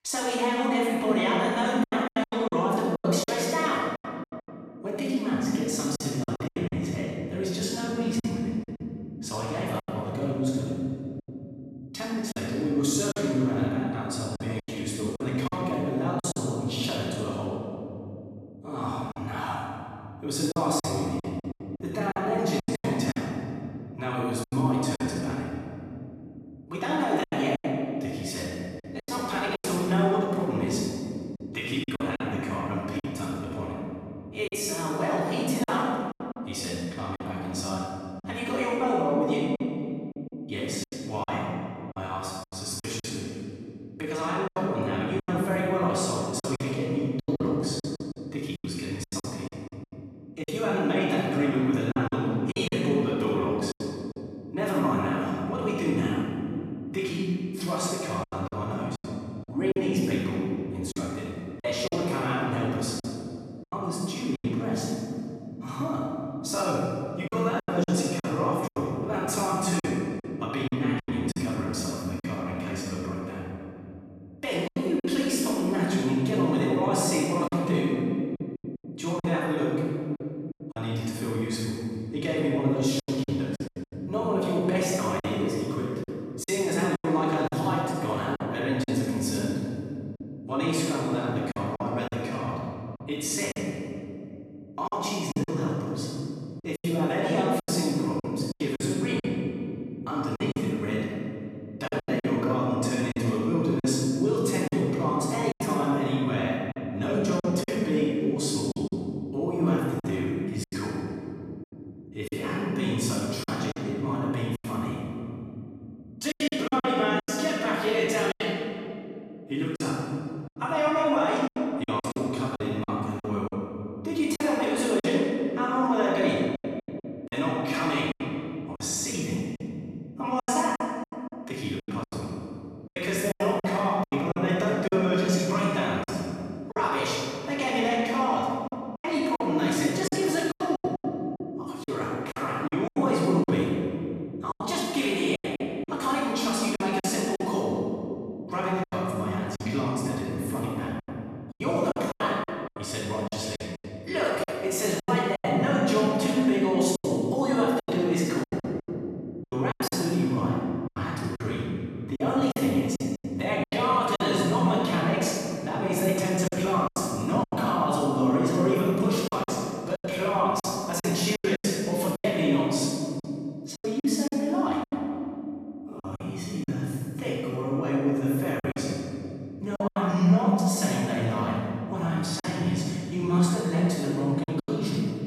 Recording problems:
room echo; strong; dies away in 3 s
off-mic speech; far
choppy; very; 8% of the speech affected

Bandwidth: 14 kHz